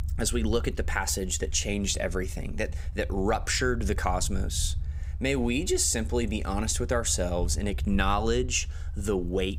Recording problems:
low rumble; faint; throughout; 25 dB below the speech

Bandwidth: 15.5 kHz